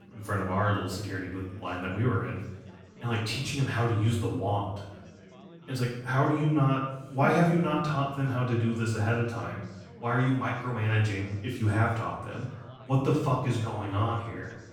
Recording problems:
off-mic speech; far
room echo; noticeable; dies away in 0.7 s
background chatter; faint; throughout; 4 voices, 25 dB below the speech

